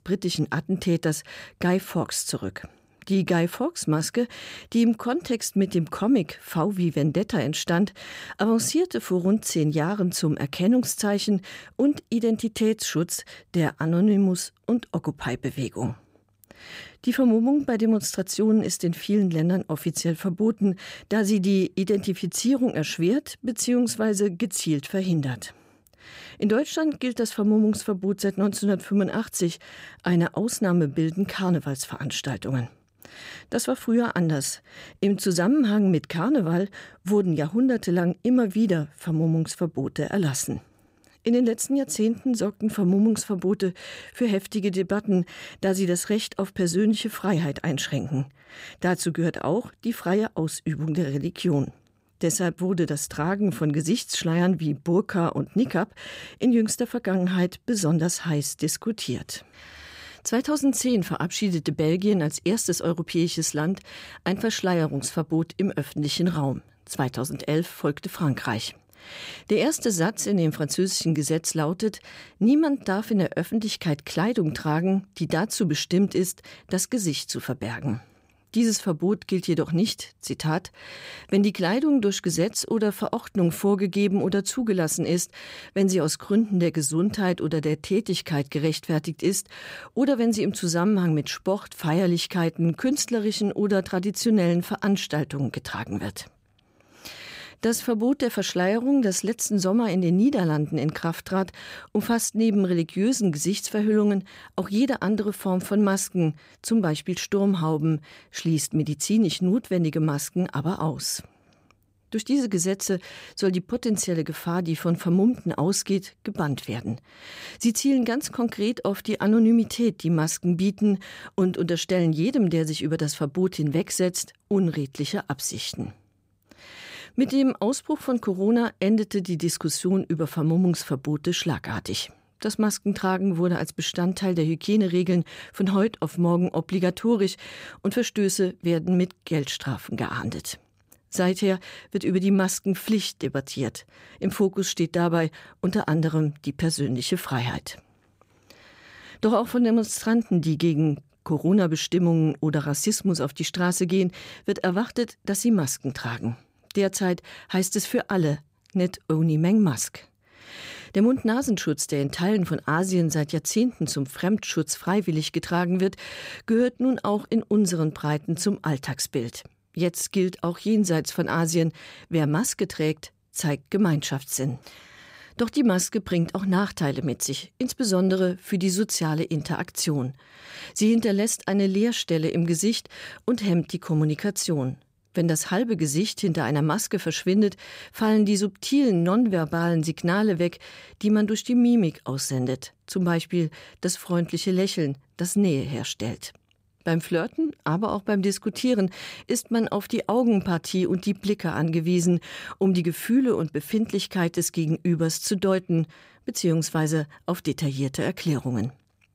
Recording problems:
none

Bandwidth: 15.5 kHz